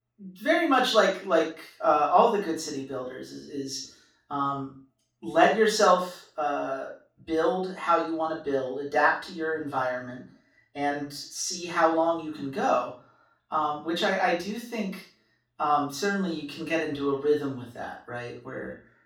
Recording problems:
off-mic speech; far
room echo; noticeable; dies away in 0.3 s

